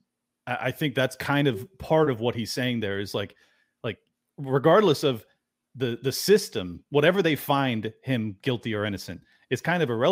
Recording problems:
abrupt cut into speech; at the end

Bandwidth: 15.5 kHz